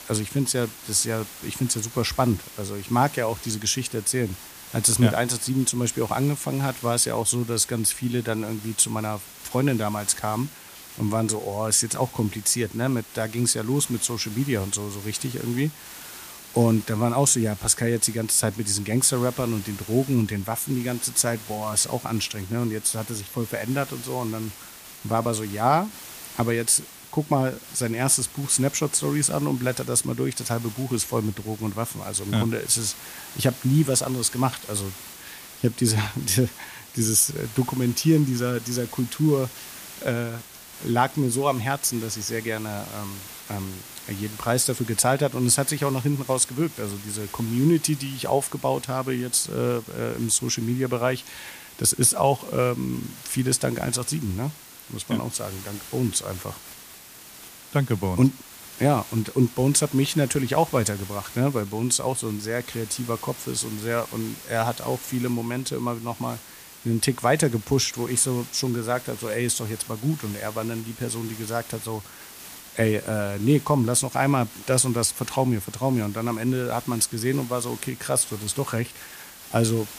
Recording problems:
hiss; noticeable; throughout; 15 dB below the speech

